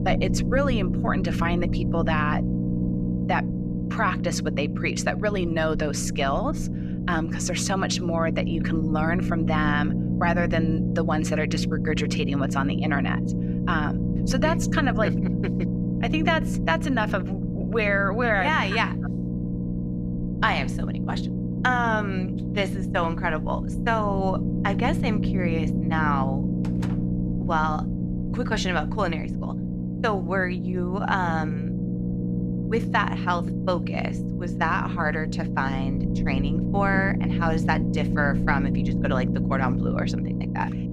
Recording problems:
low rumble; loud; throughout; 8 dB below the speech
door banging; faint; at 27 s; peak 10 dB below the speech

